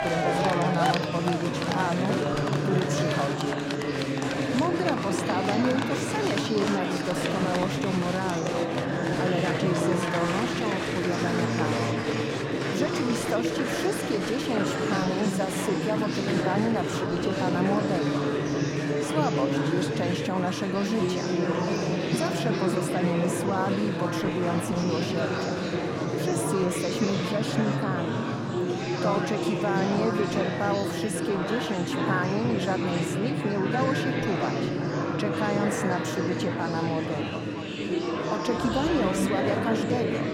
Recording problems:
murmuring crowd; very loud; throughout; 2 dB above the speech

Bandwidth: 16.5 kHz